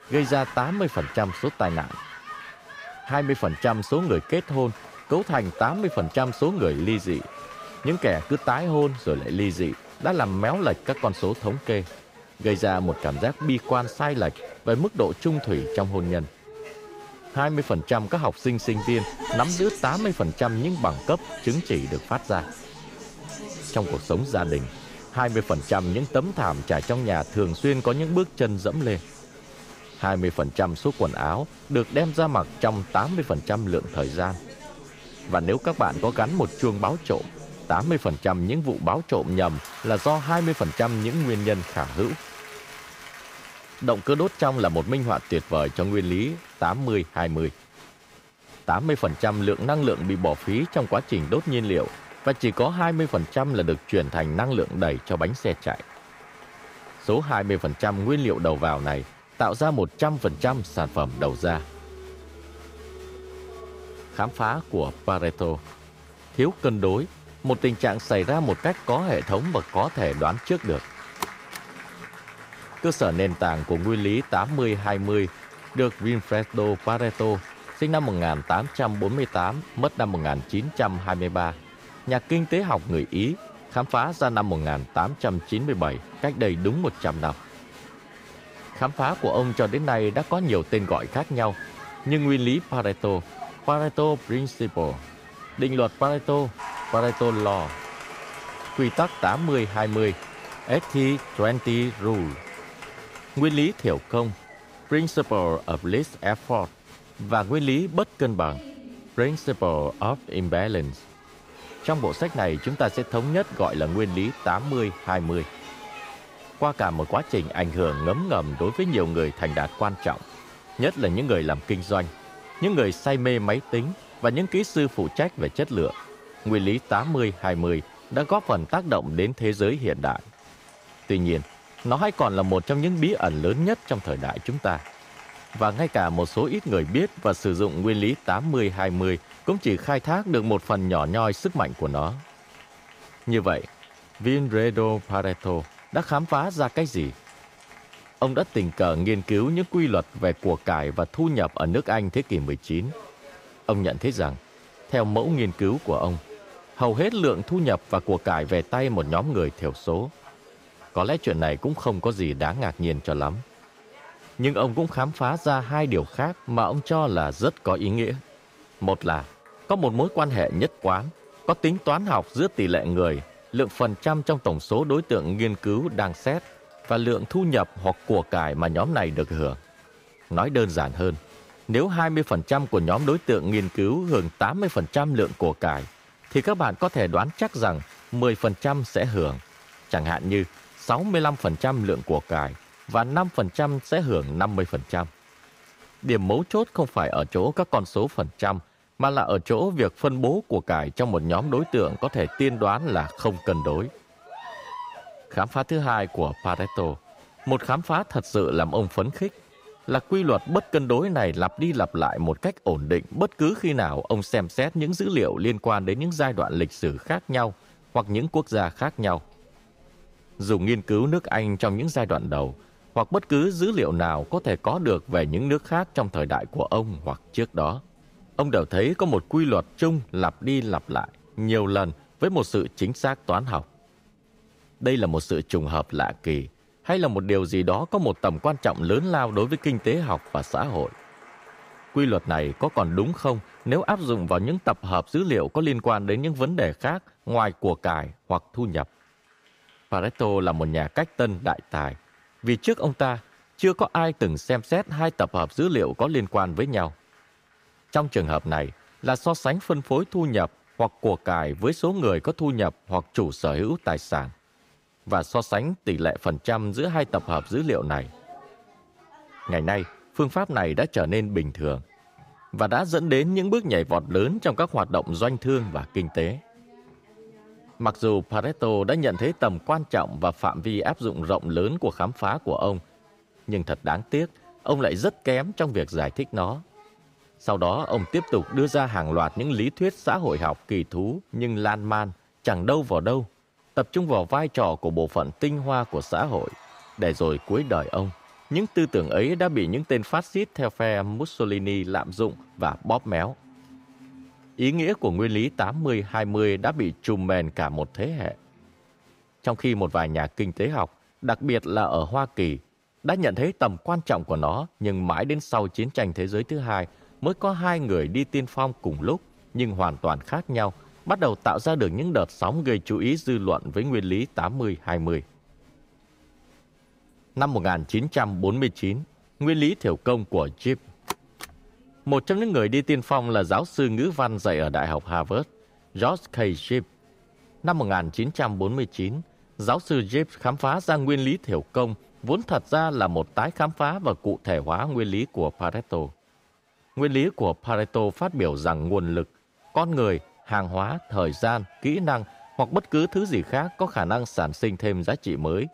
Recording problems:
crowd noise; noticeable; throughout; 20 dB below the speech

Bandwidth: 15.5 kHz